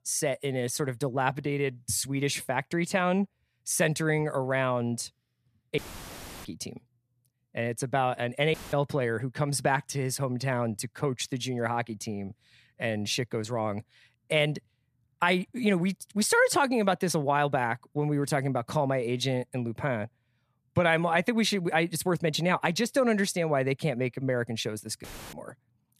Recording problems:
audio cutting out; filled with static; at 6 s for 0.5 s, at 8.5 s and at 25 s

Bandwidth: 14.5 kHz